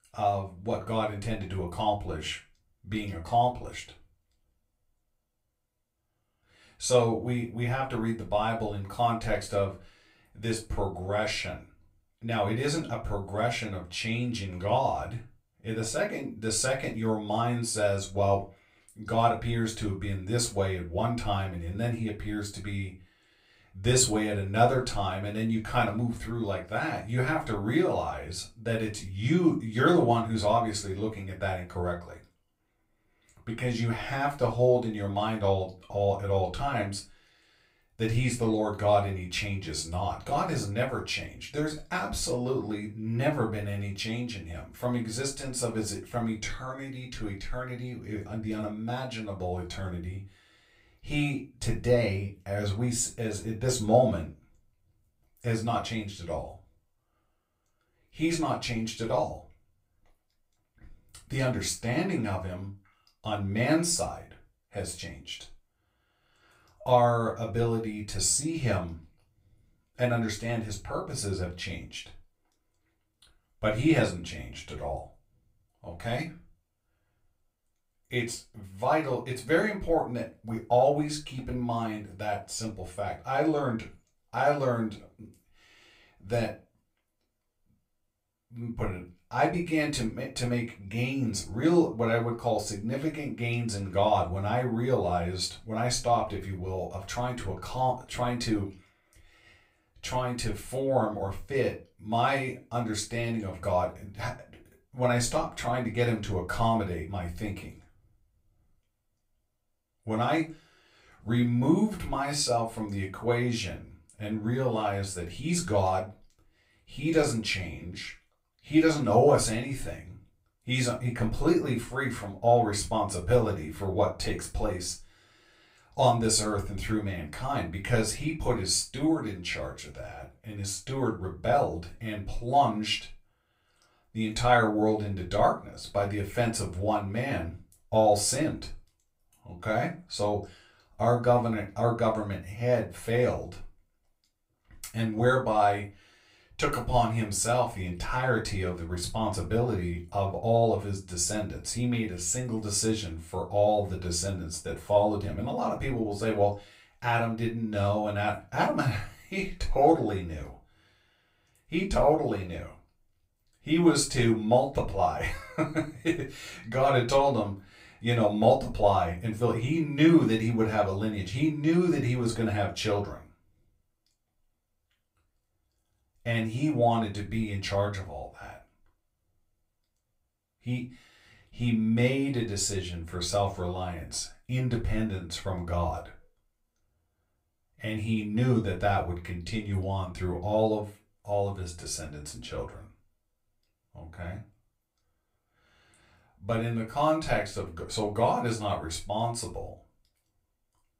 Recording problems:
off-mic speech; far
room echo; very slight; dies away in 0.2 s

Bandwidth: 15.5 kHz